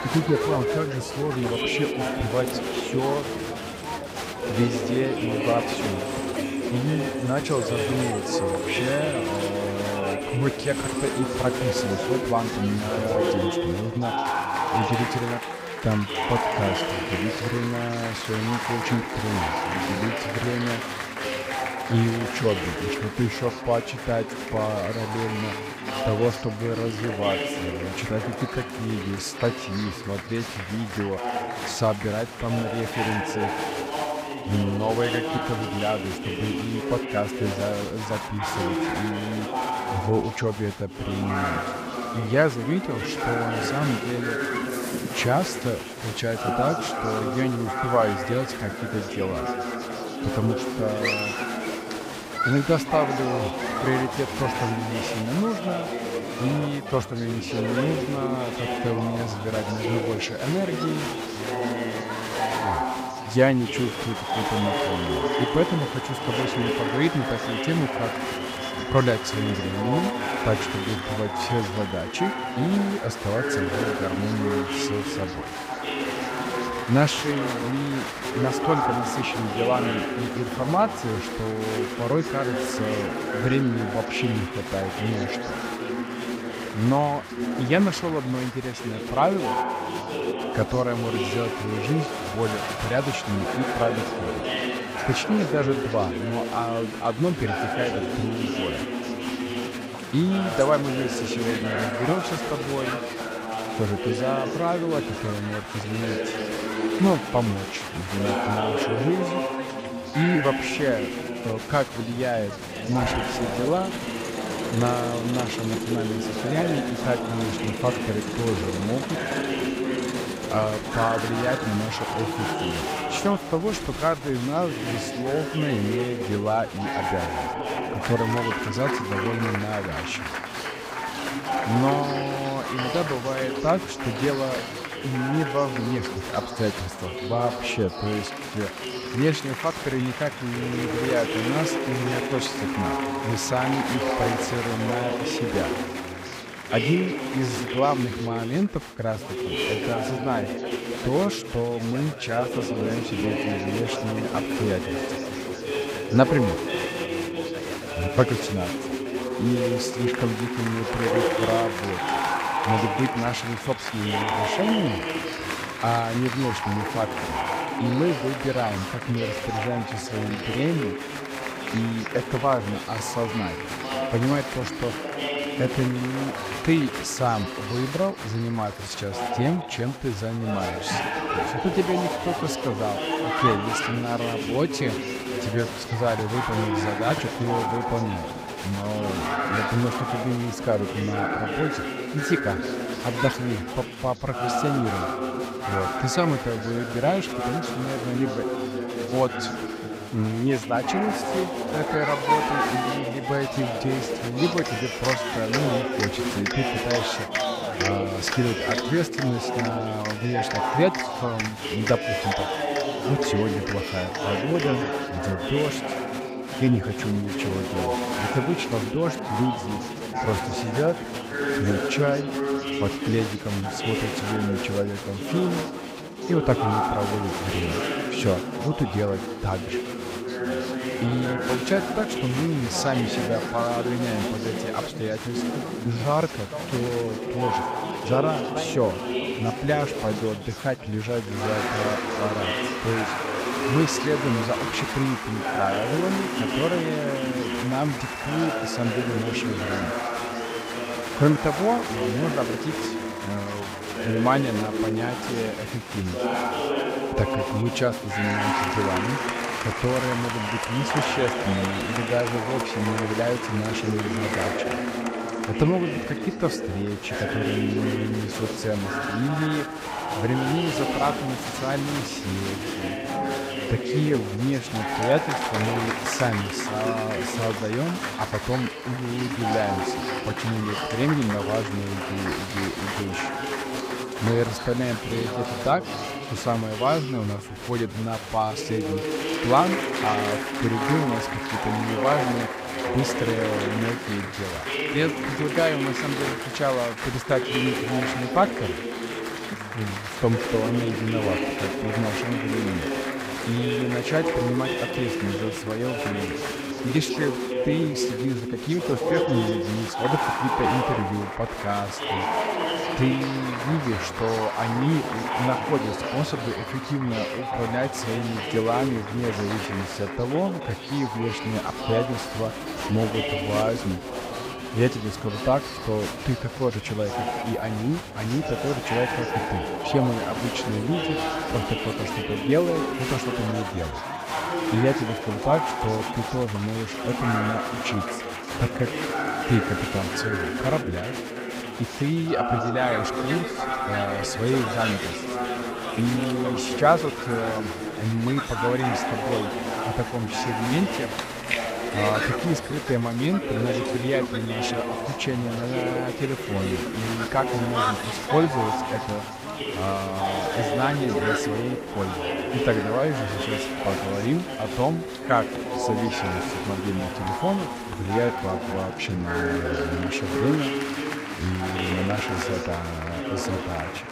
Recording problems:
chatter from many people; loud; throughout; 1 dB below the speech

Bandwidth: 15.5 kHz